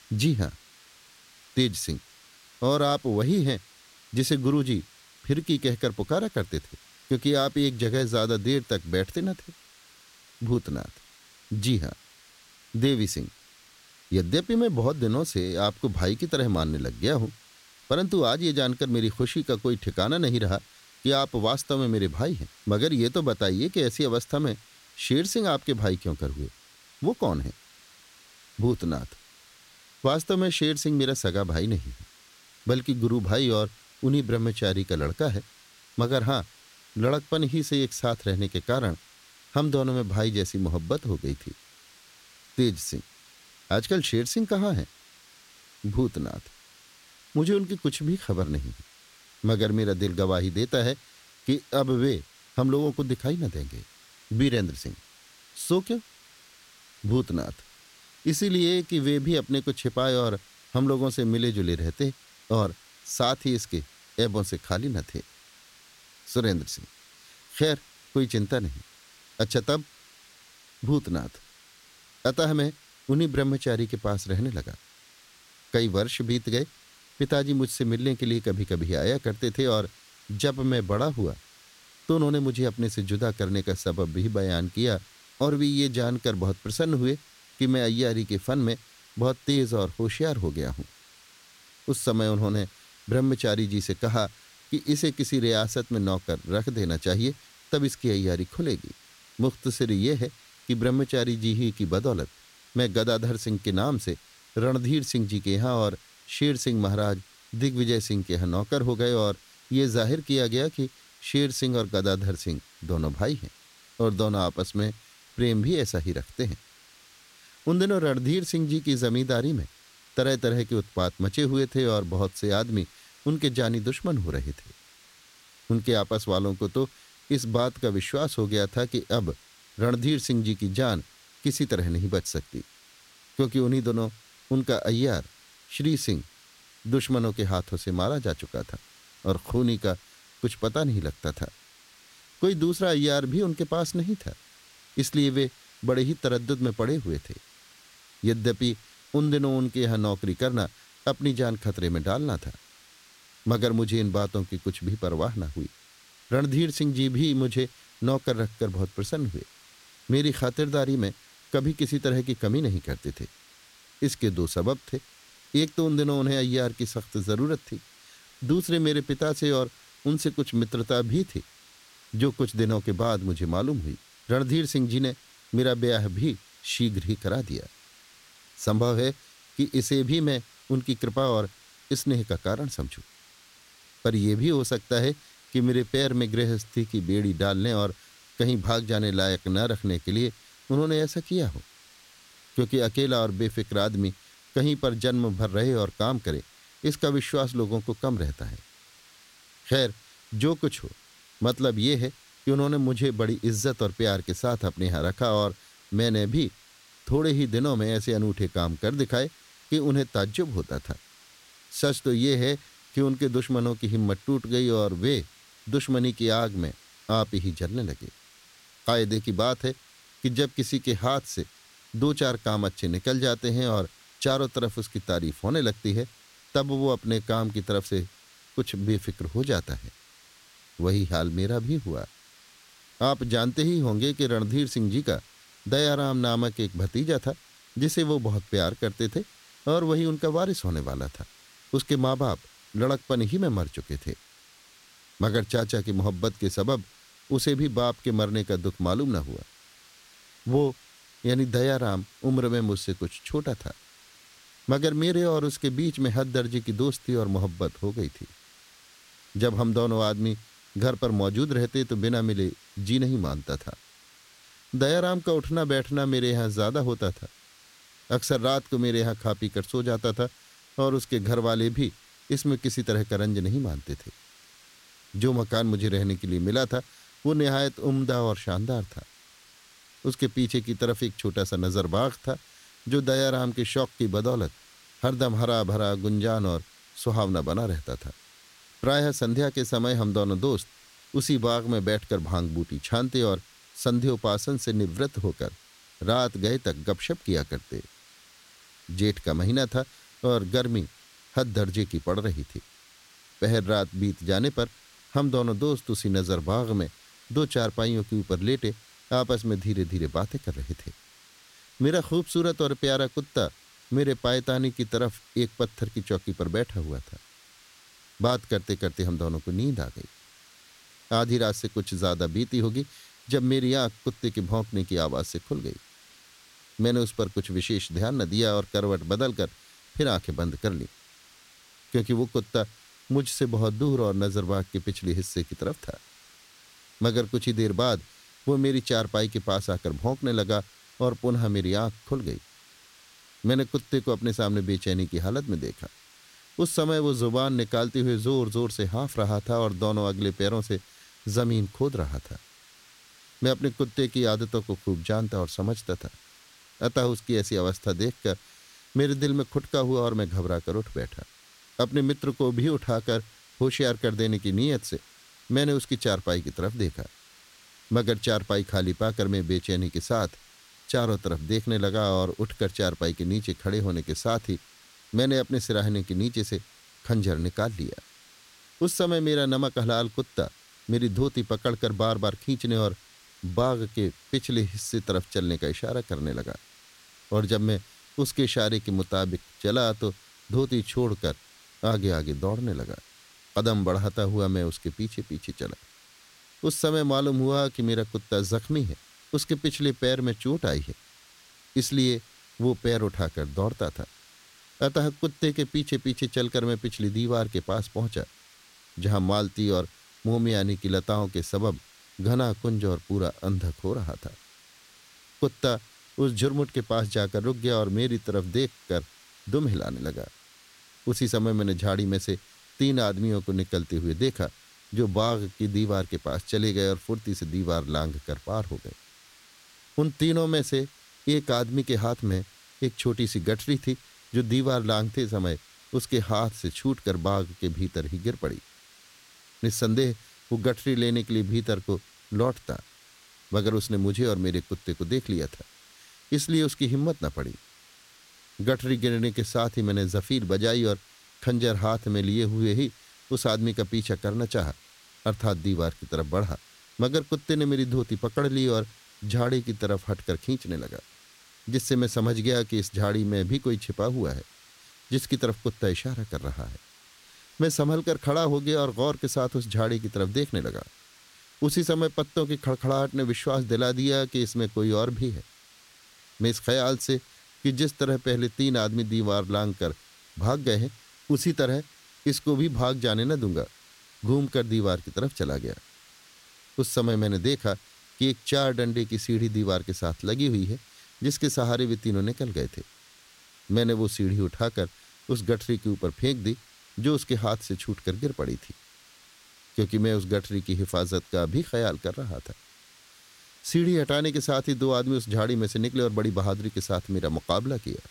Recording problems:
hiss; faint; throughout; 25 dB below the speech

